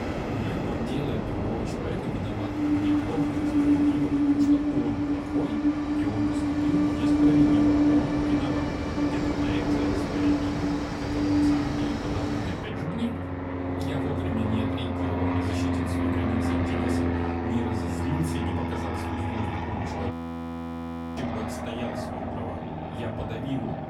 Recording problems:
off-mic speech; far
room echo; very slight; dies away in 0.3 s
train or aircraft noise; very loud; throughout; 8 dB above the speech
electrical hum; noticeable; throughout; 50 Hz, 20 dB below the speech
audio freezing; at 20 s for 1 s

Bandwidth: 18 kHz